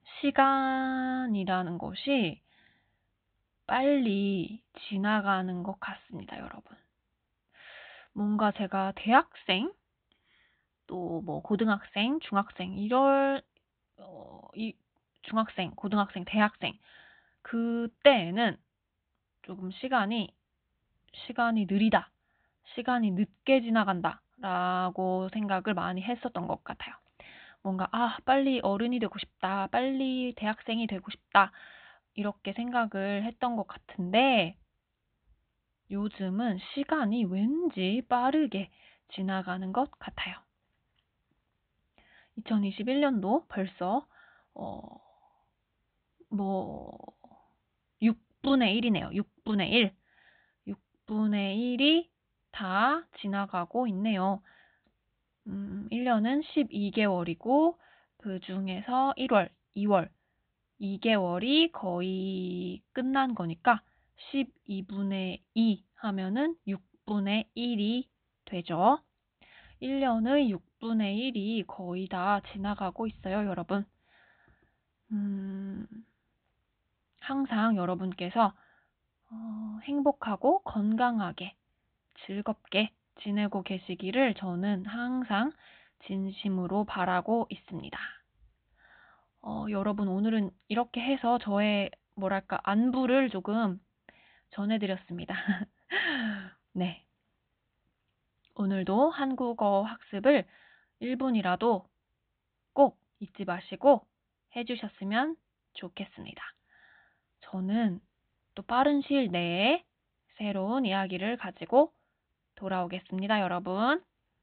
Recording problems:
high frequencies cut off; severe; nothing above 4 kHz

